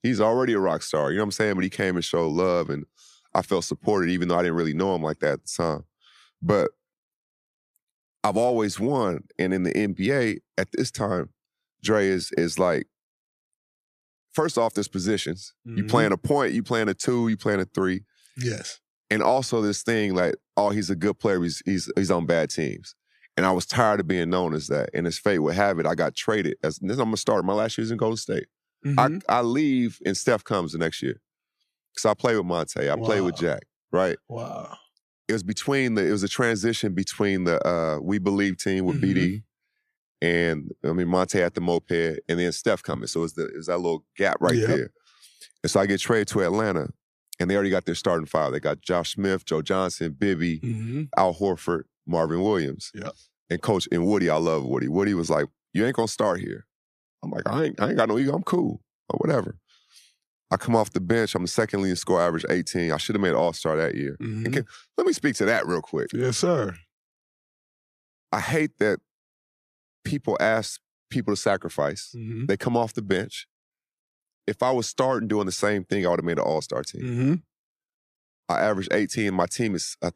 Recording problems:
none

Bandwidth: 14.5 kHz